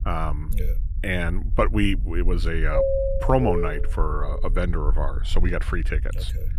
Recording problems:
low rumble; faint; throughout; 20 dB below the speech
doorbell; loud; from 2.5 to 4 s; peak 5 dB above the speech

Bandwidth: 15 kHz